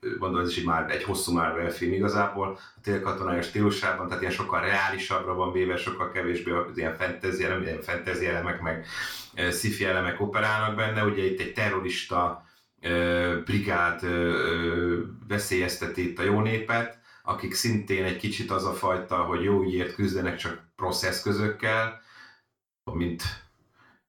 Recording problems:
off-mic speech; far
room echo; slight; dies away in 0.3 s

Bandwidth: 18 kHz